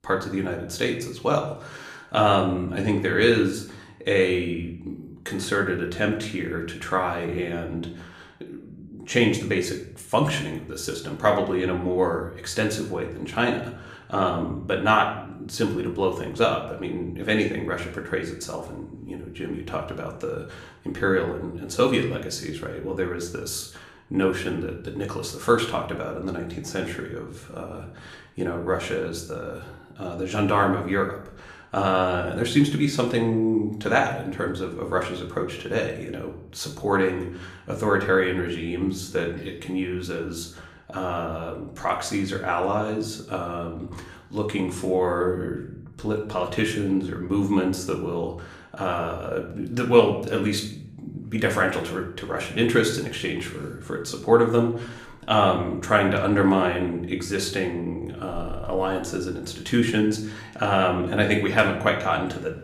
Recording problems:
room echo; slight; dies away in 0.6 s
off-mic speech; somewhat distant

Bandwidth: 15 kHz